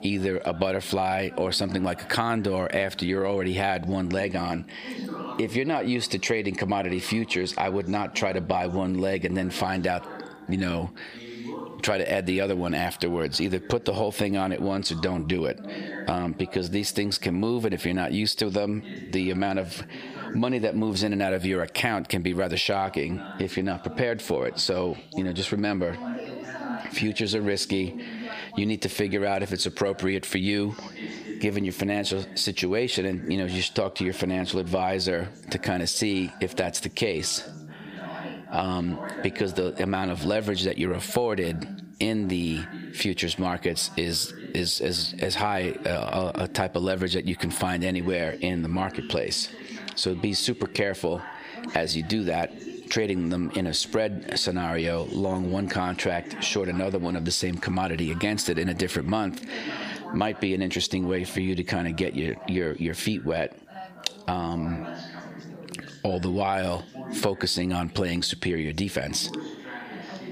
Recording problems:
squashed, flat; heavily, background pumping
background chatter; noticeable; throughout; 2 voices, 15 dB below the speech

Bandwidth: 15 kHz